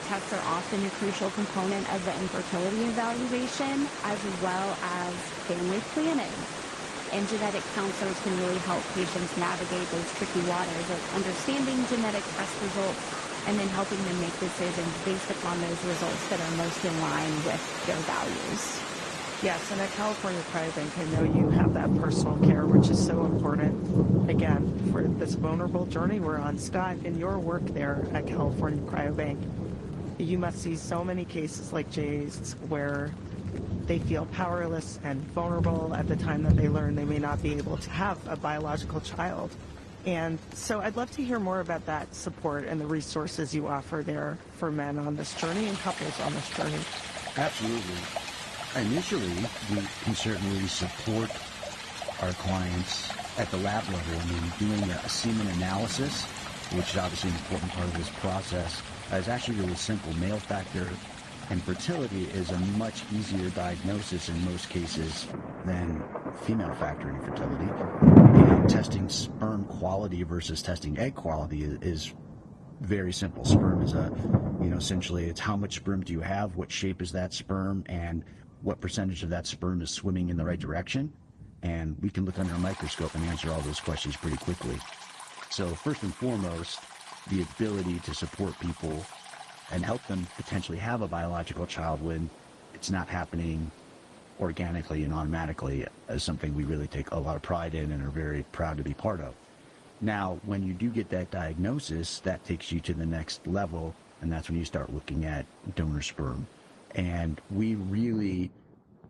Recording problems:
garbled, watery; slightly; nothing above 10 kHz
rain or running water; very loud; throughout; 2 dB above the speech

